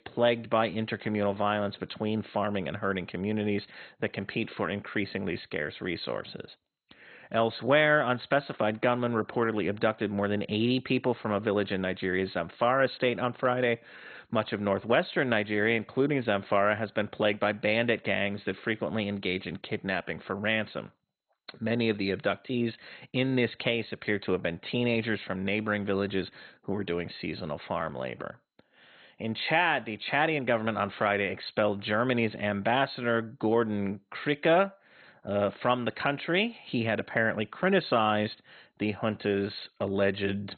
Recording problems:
garbled, watery; badly; nothing above 4 kHz

